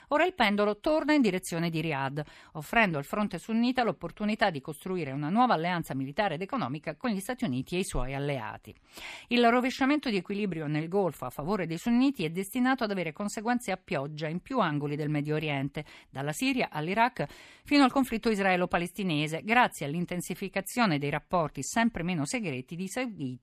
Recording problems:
none

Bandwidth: 14 kHz